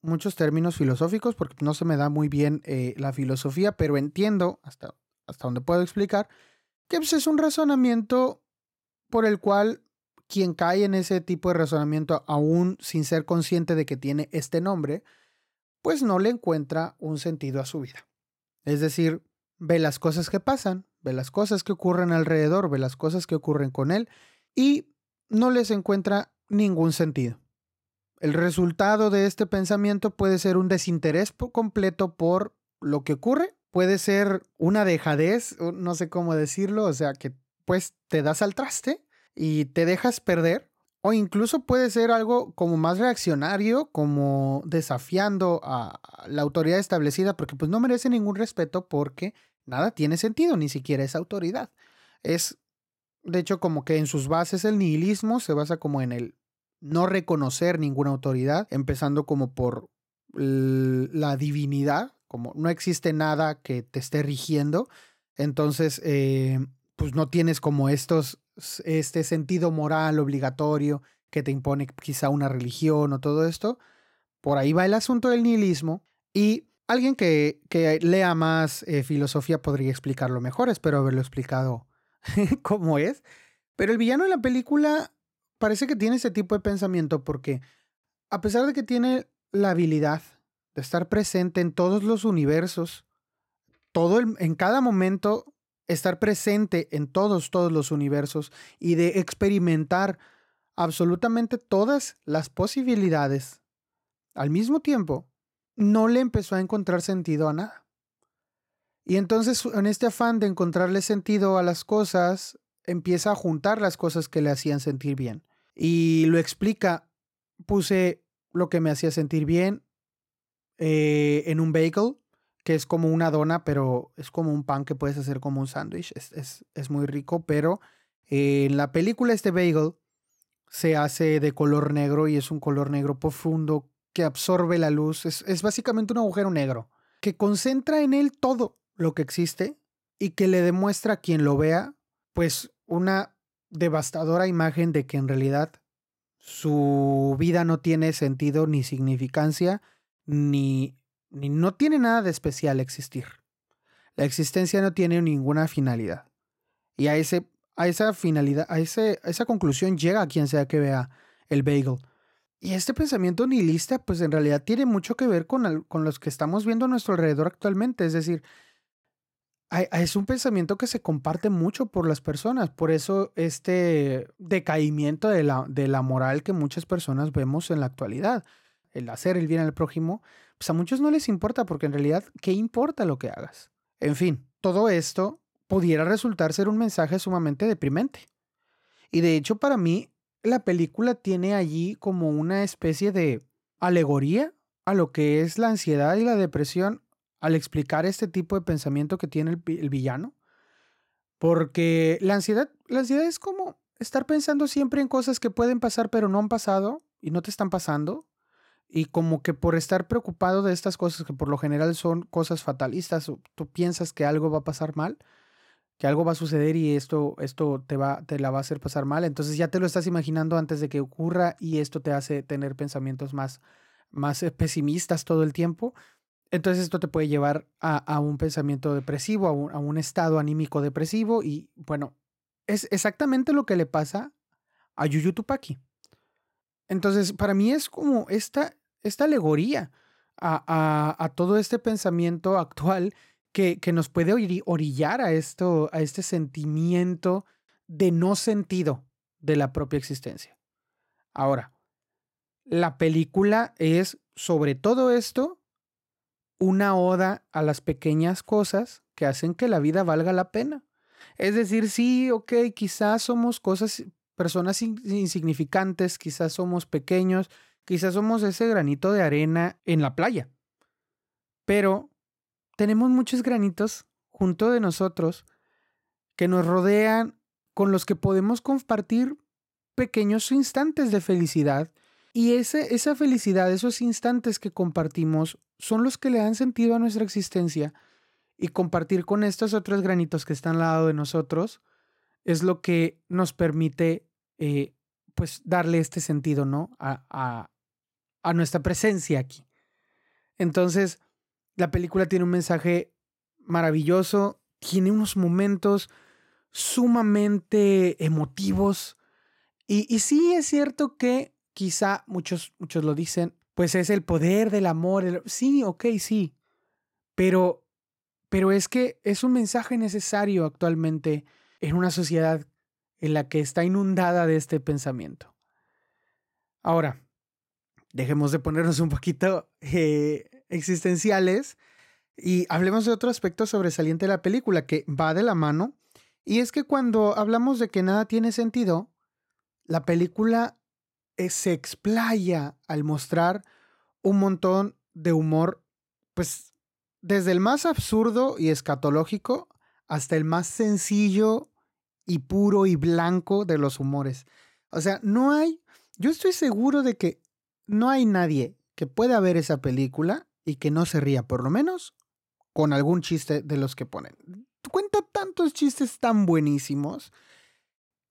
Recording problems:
none

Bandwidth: 16 kHz